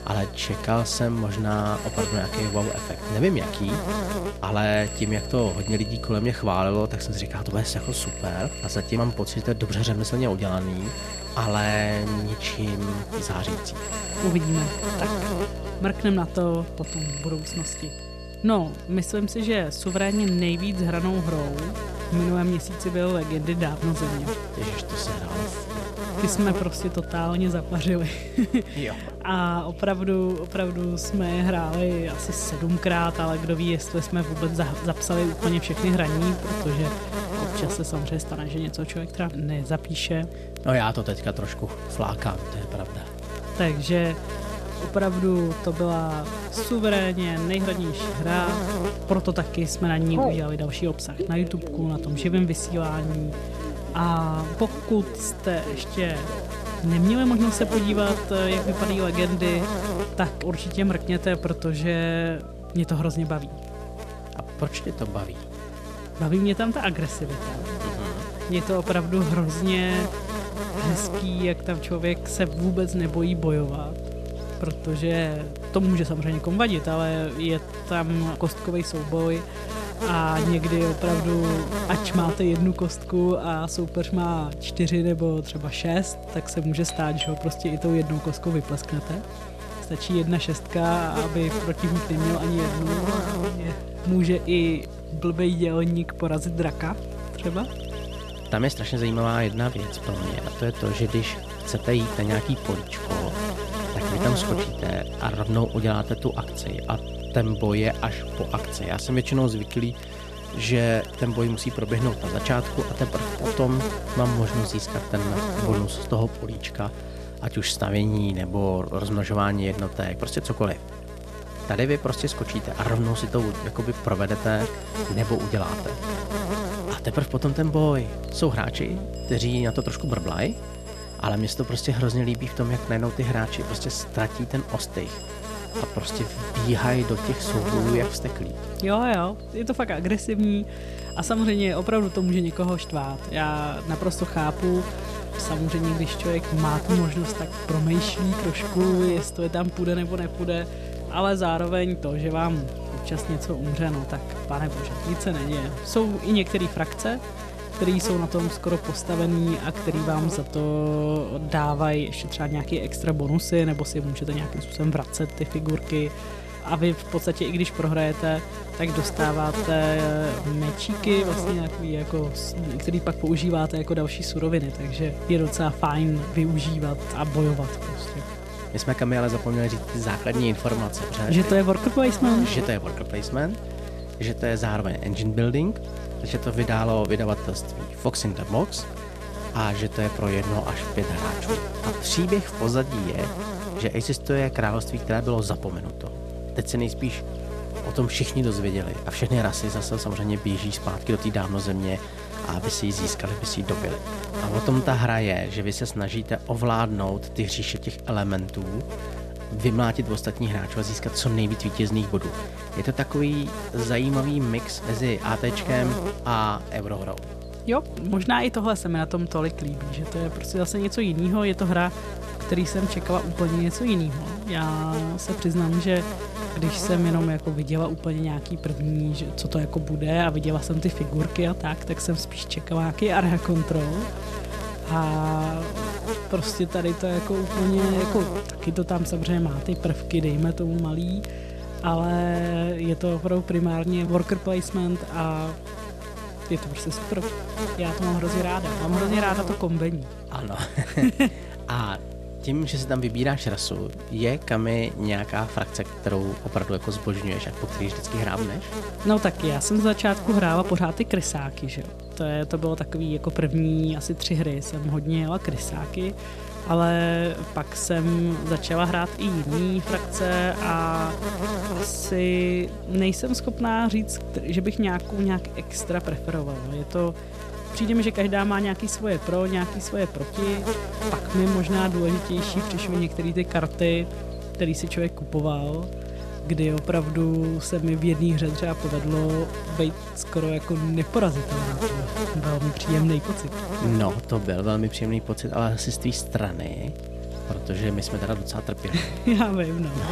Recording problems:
electrical hum; loud; throughout; 60 Hz, 7 dB below the speech
alarms or sirens; noticeable; throughout; 15 dB below the speech
crackle, like an old record; faint; 30 dB below the speech
abrupt cut into speech; at the end

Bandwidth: 14 kHz